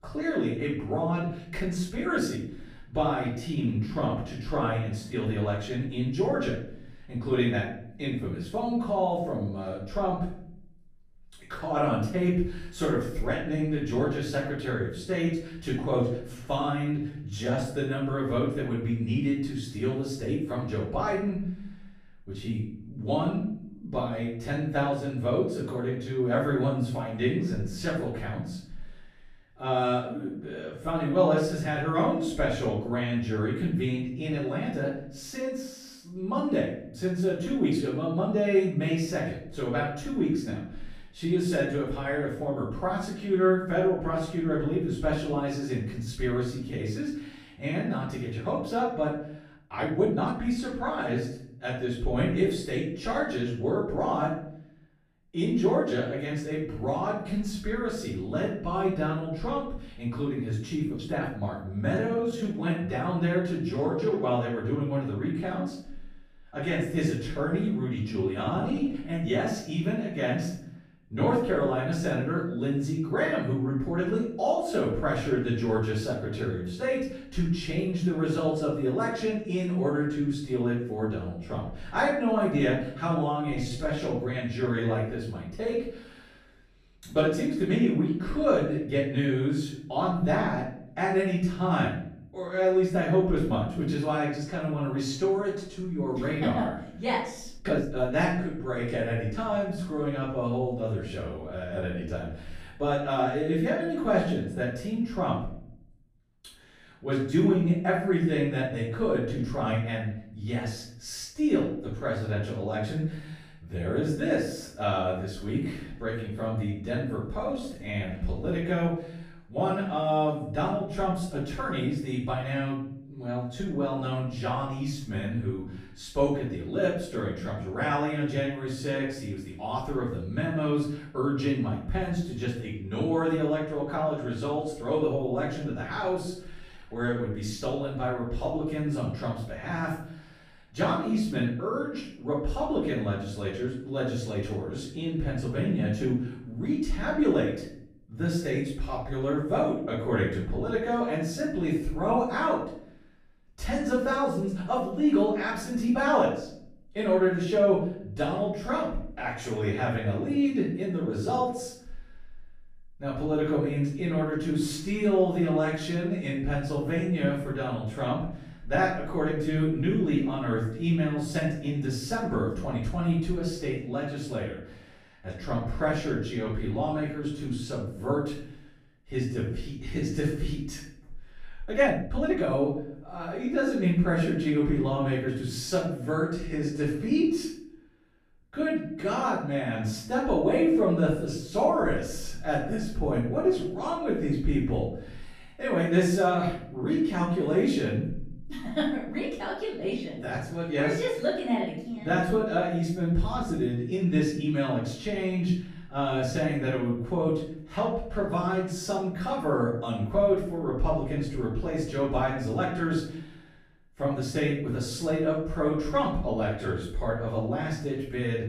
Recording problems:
off-mic speech; far
room echo; noticeable; dies away in 0.6 s
uneven, jittery; strongly; from 1.5 s to 3:03

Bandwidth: 14.5 kHz